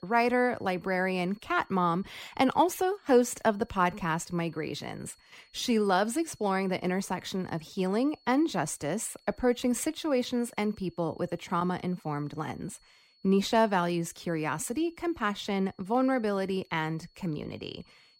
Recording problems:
high-pitched whine; faint; throughout; 4.5 kHz, 35 dB below the speech

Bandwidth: 16 kHz